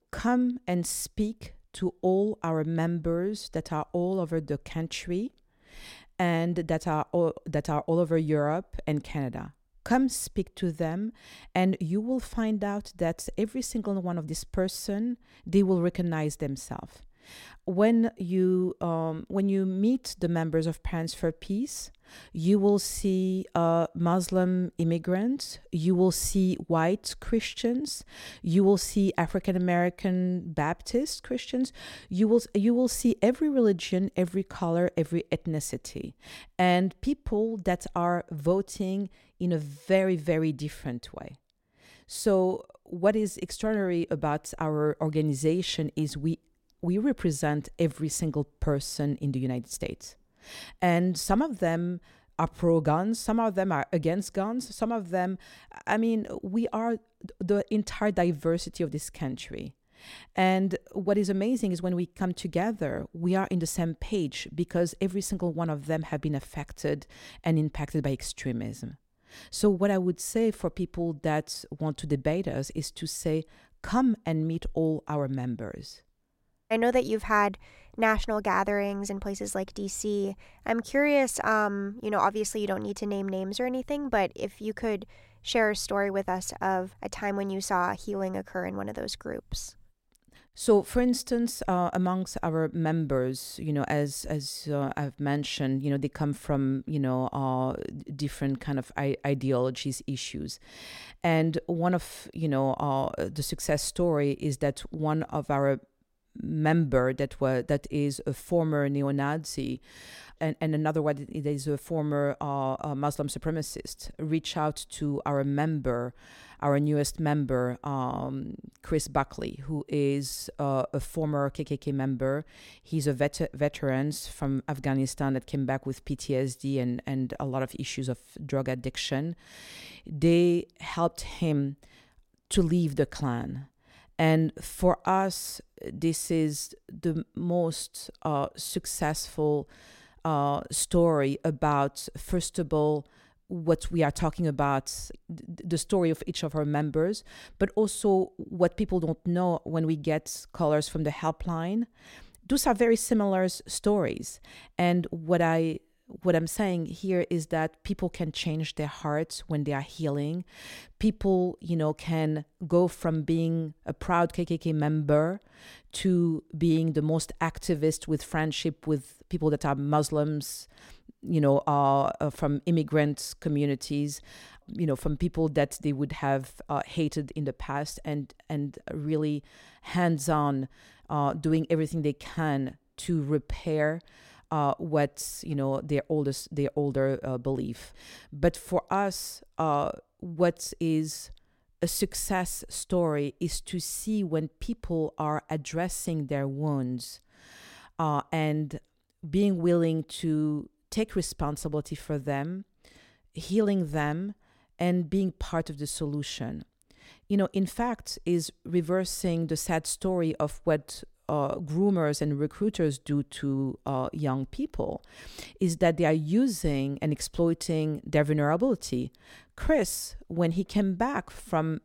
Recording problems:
none

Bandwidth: 16.5 kHz